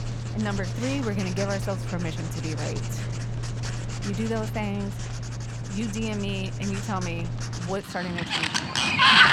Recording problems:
household noises; very loud; throughout; 4 dB above the speech

